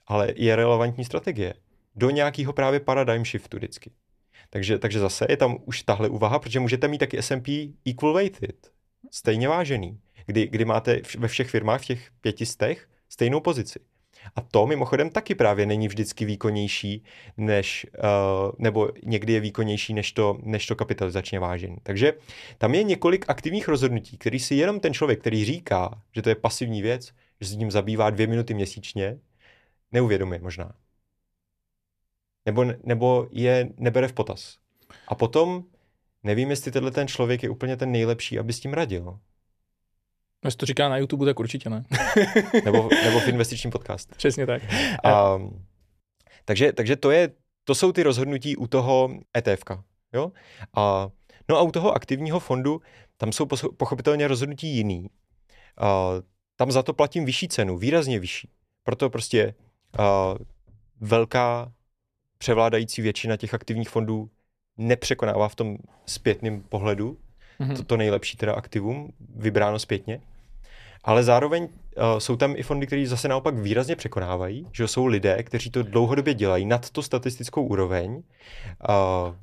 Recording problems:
none

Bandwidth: 14 kHz